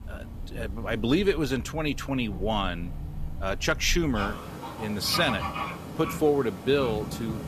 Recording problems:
animal sounds; loud; throughout; 9 dB below the speech

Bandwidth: 14.5 kHz